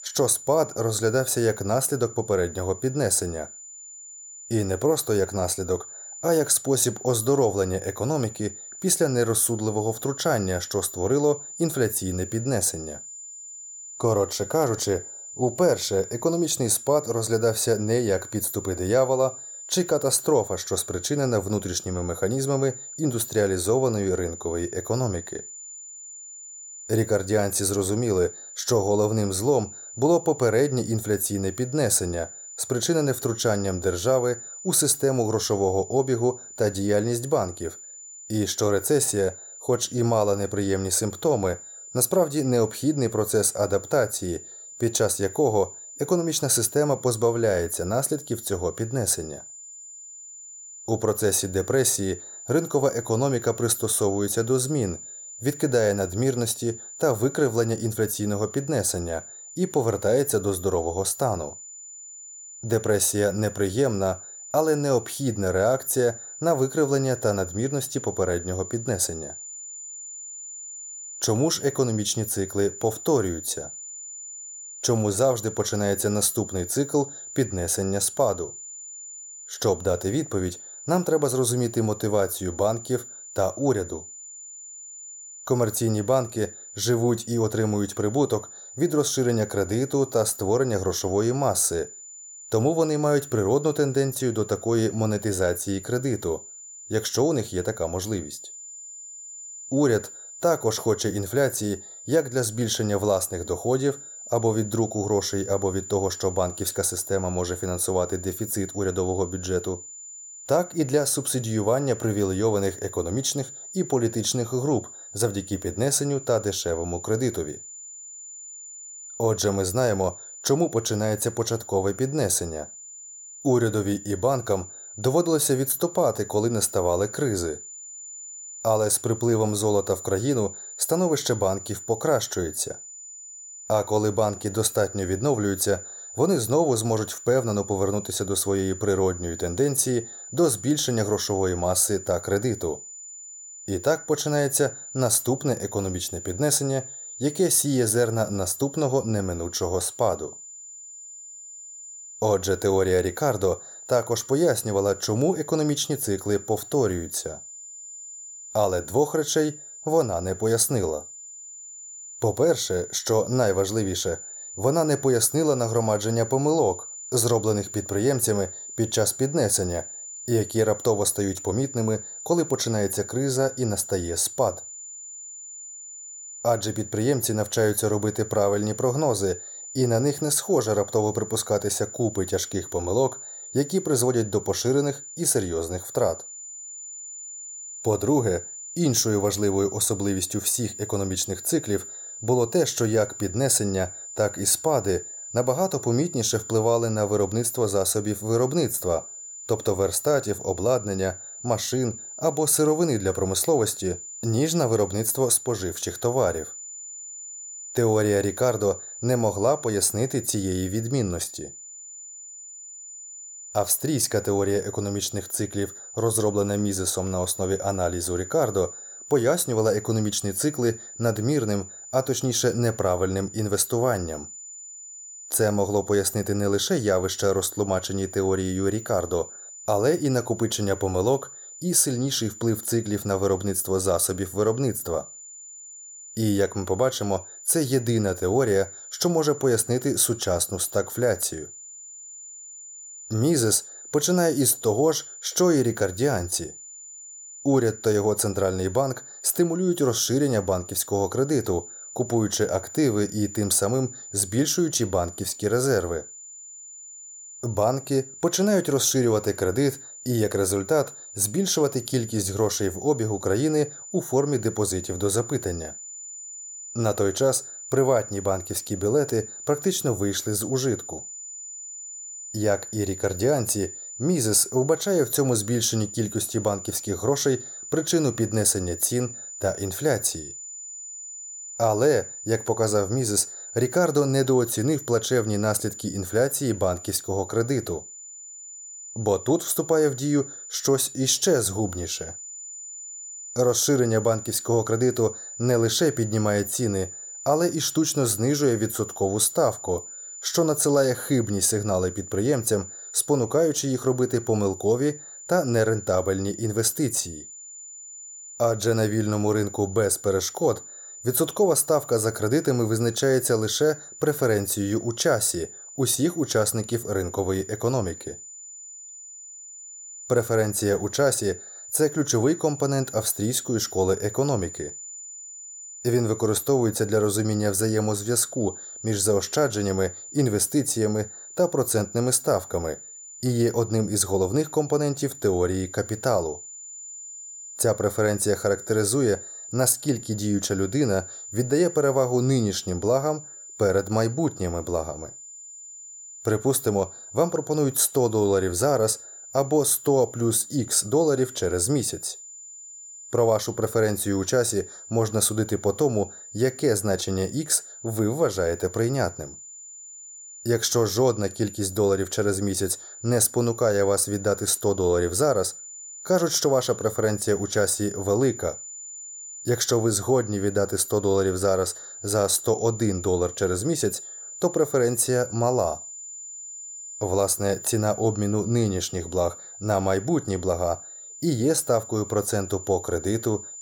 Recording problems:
high-pitched whine; noticeable; throughout; 7 kHz, 15 dB below the speech

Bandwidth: 18 kHz